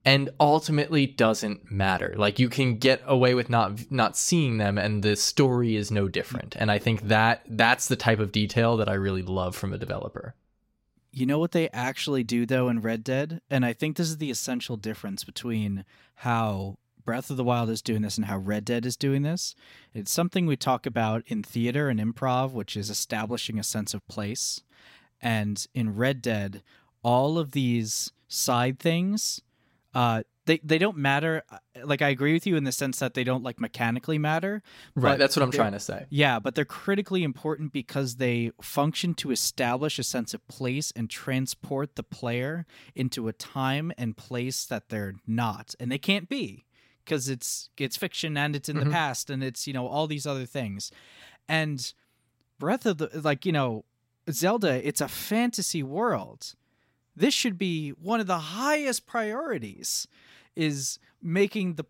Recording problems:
none

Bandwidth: 16 kHz